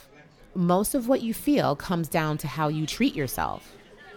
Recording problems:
murmuring crowd; faint; throughout; 25 dB below the speech

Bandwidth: 18 kHz